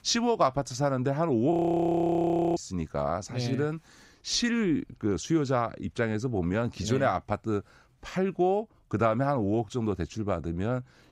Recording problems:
audio freezing; at 1.5 s for 1 s

